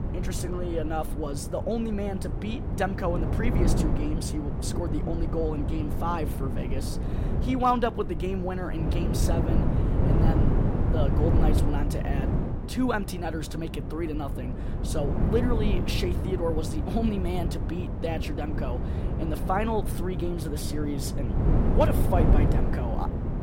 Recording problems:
wind noise on the microphone; heavy; 5 dB below the speech

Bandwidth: 16 kHz